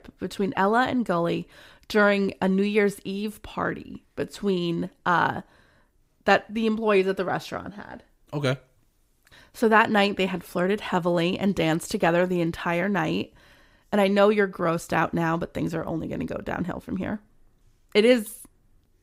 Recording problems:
none

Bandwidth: 15.5 kHz